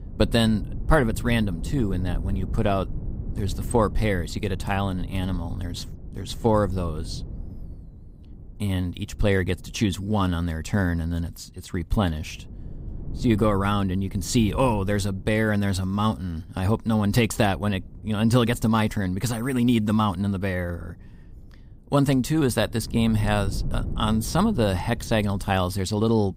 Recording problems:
wind noise on the microphone; occasional gusts; 20 dB below the speech

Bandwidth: 15.5 kHz